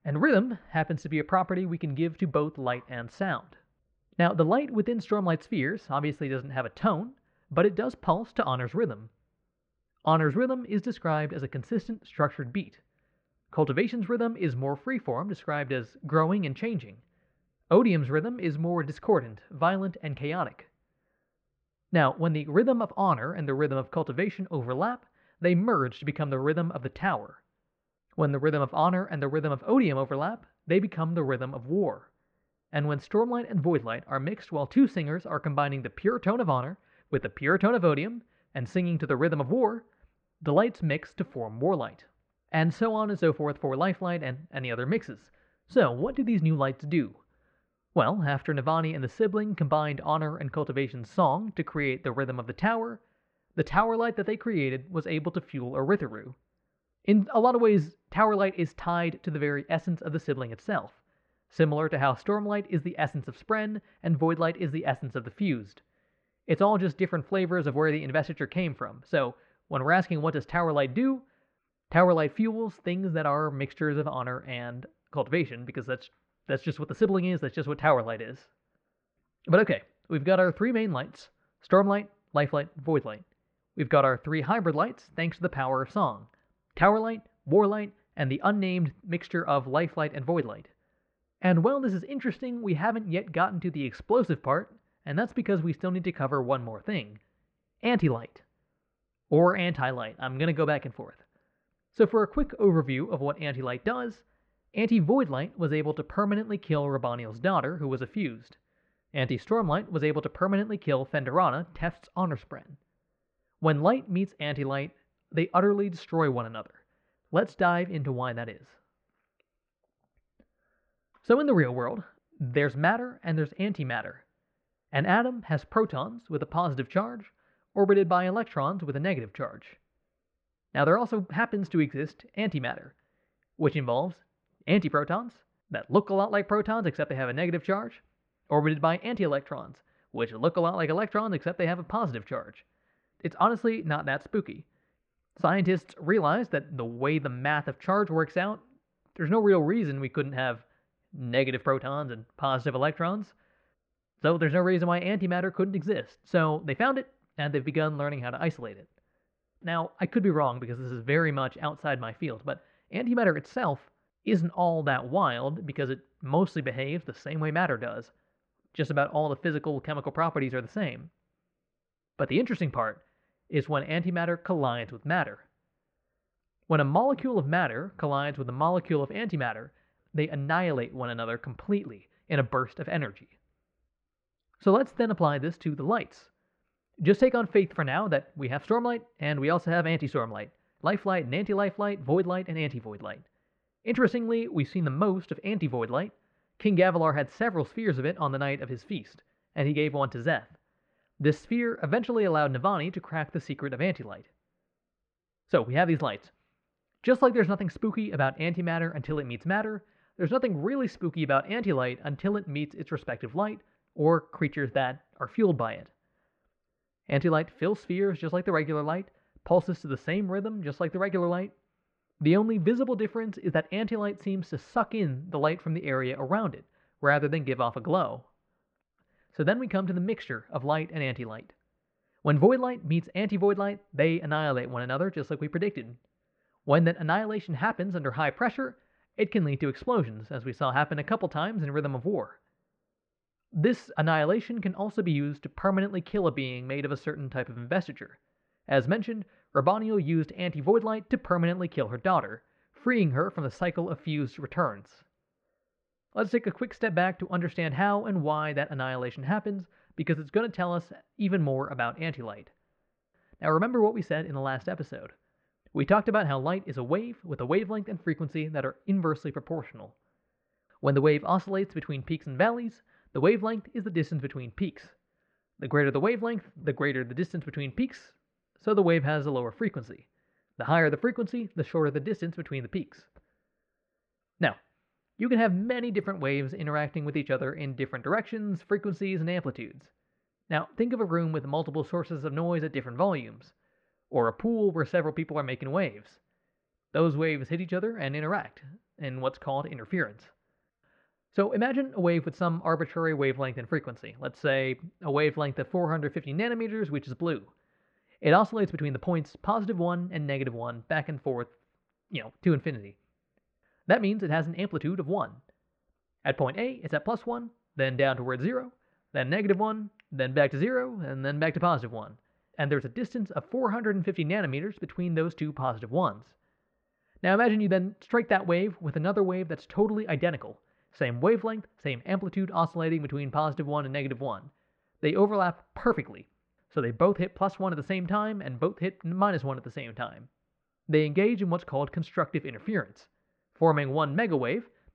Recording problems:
muffled; very; fading above 2.5 kHz

